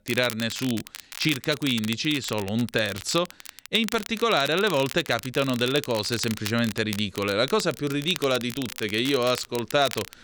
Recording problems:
crackle, like an old record; noticeable; 10 dB below the speech

